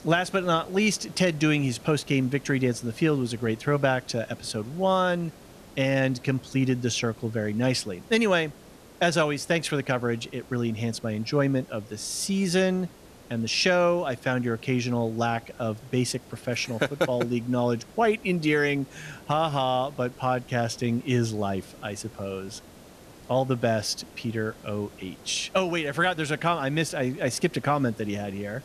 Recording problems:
hiss; faint; throughout; 20 dB below the speech

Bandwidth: 14 kHz